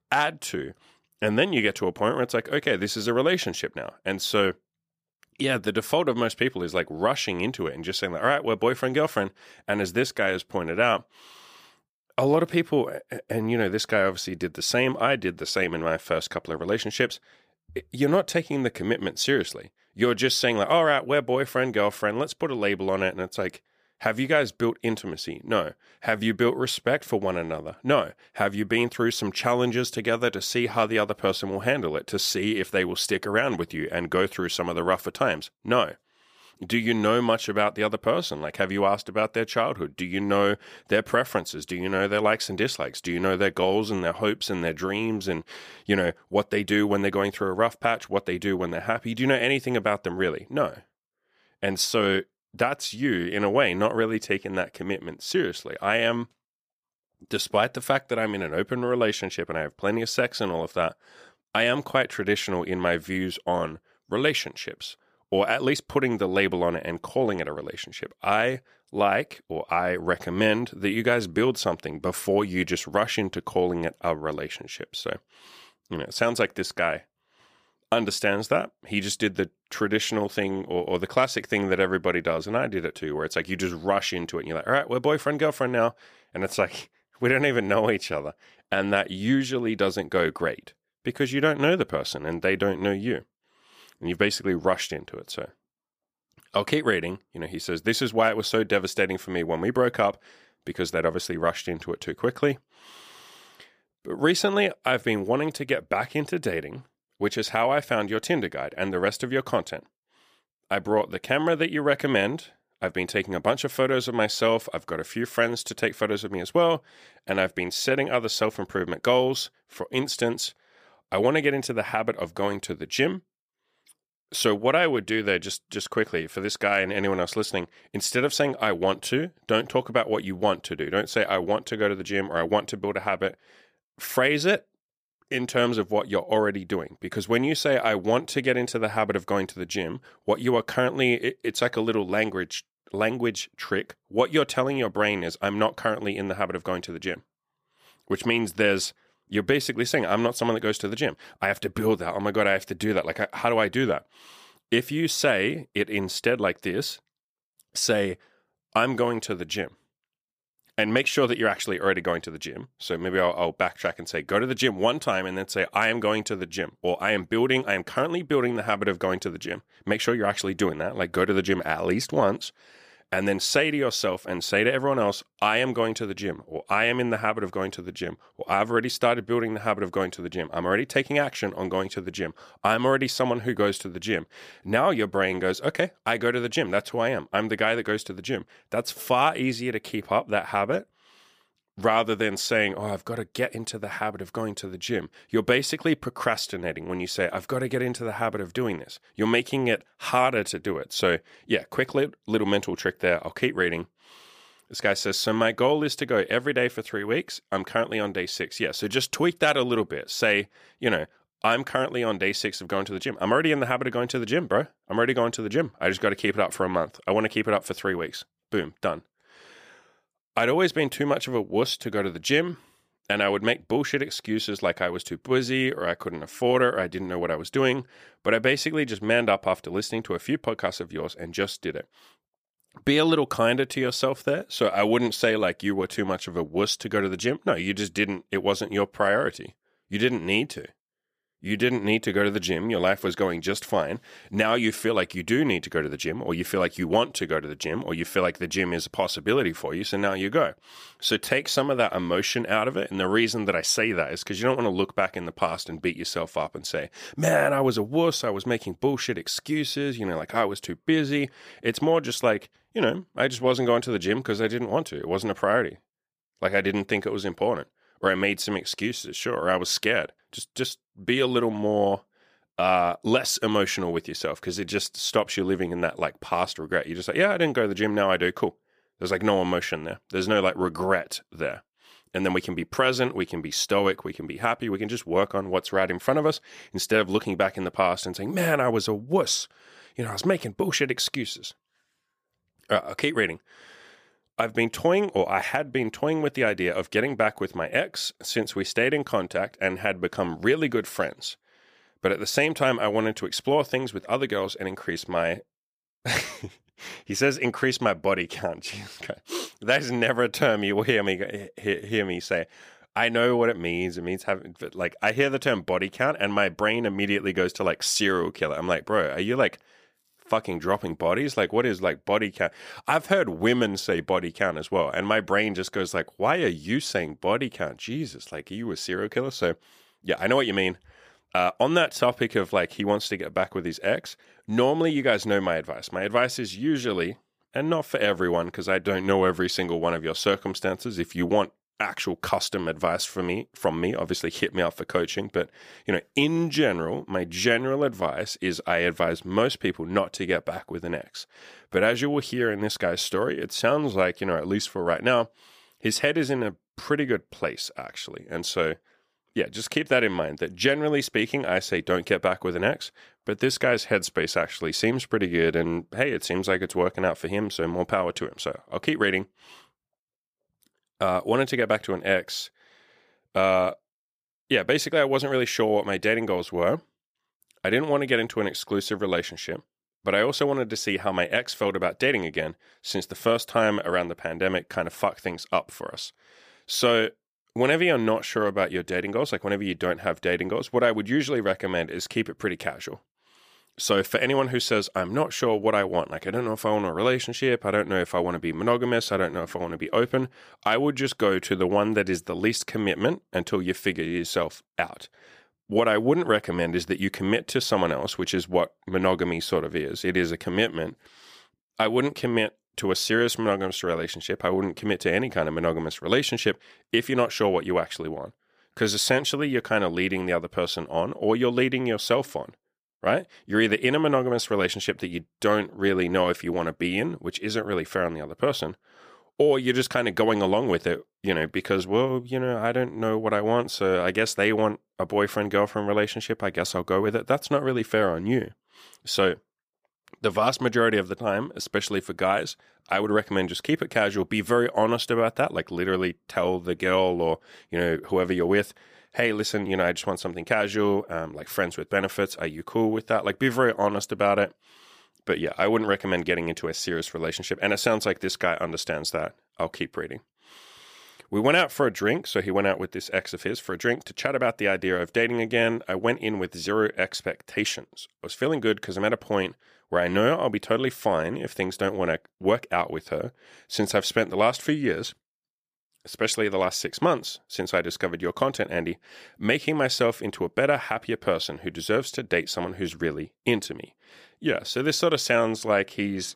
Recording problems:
none

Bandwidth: 15 kHz